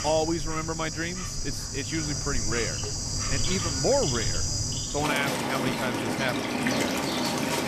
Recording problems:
animal sounds; very loud; throughout; 3 dB above the speech

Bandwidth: 14.5 kHz